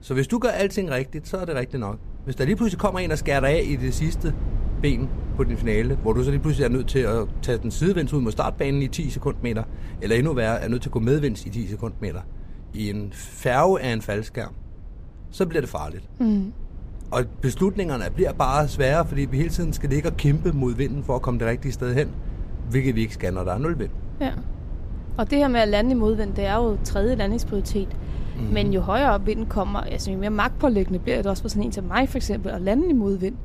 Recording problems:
low rumble; faint; throughout; 20 dB below the speech

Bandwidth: 14.5 kHz